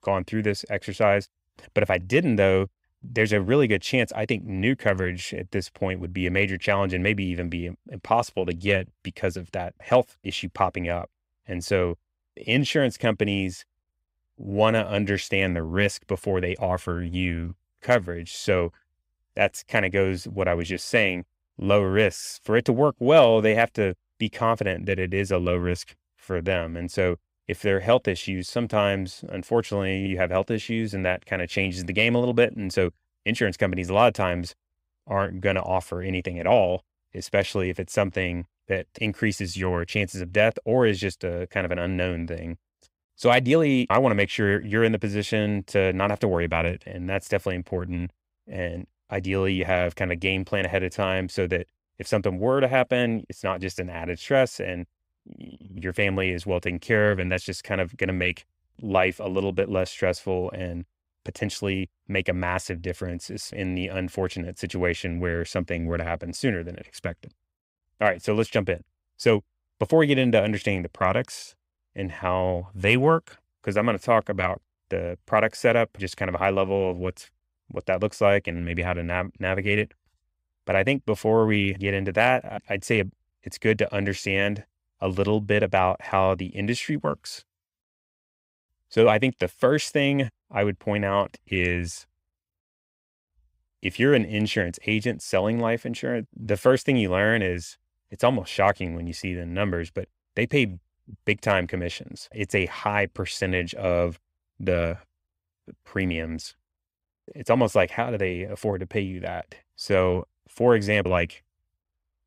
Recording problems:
none

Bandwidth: 15.5 kHz